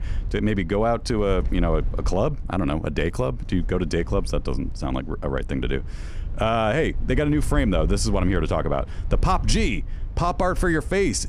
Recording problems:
low rumble; faint; throughout; 25 dB below the speech

